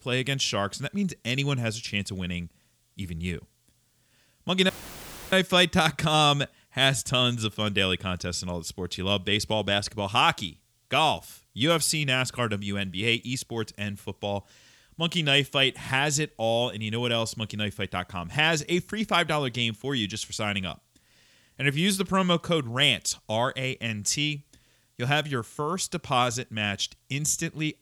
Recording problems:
audio cutting out; filled with static; at 4.5 s for 0.5 s

